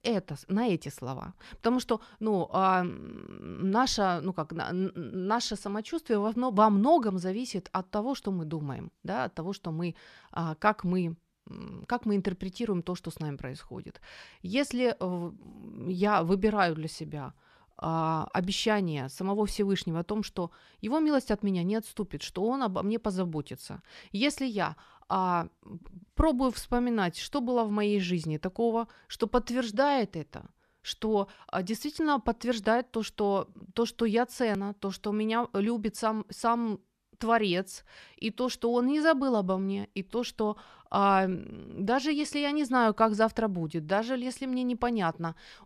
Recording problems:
none

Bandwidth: 13.5 kHz